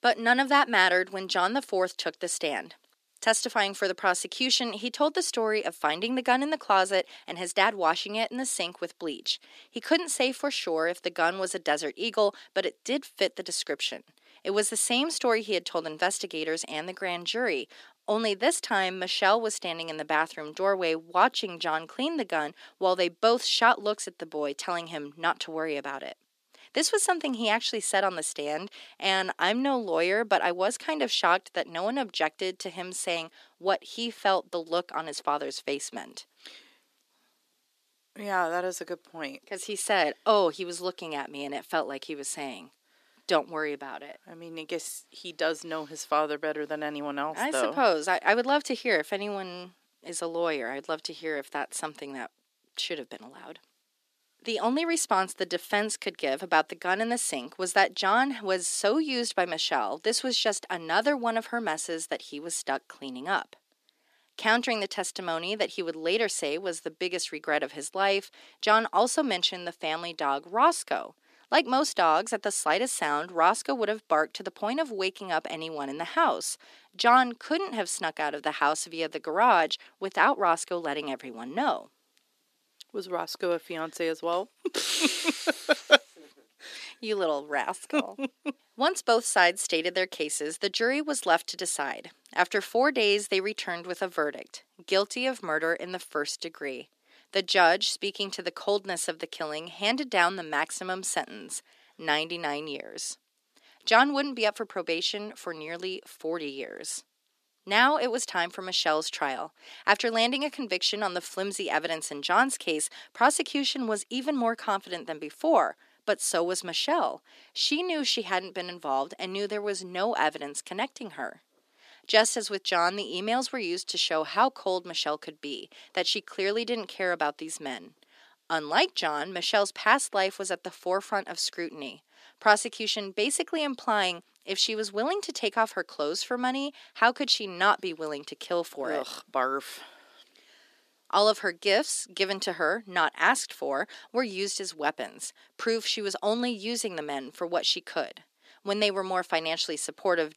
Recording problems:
thin; somewhat; fading below 300 Hz

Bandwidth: 14.5 kHz